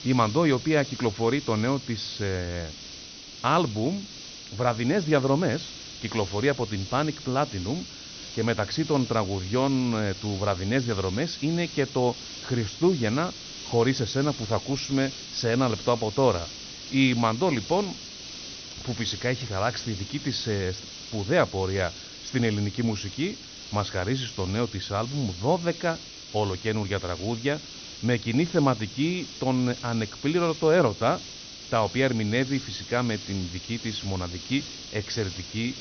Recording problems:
high frequencies cut off; noticeable; nothing above 6 kHz
hiss; noticeable; throughout; 10 dB below the speech

